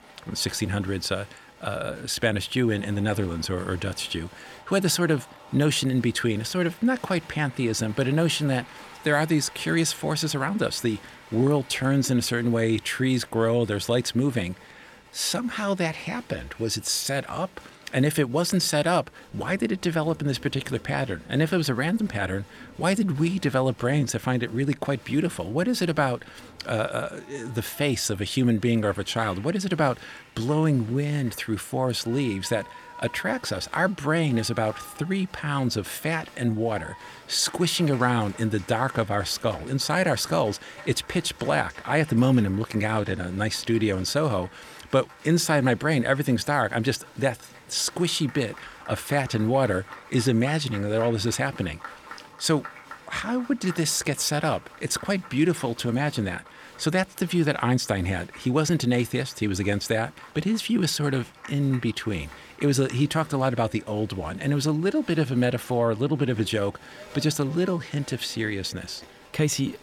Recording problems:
crowd noise; faint; throughout; 20 dB below the speech

